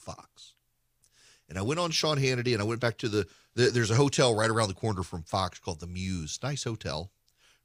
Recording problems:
none

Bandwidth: 15 kHz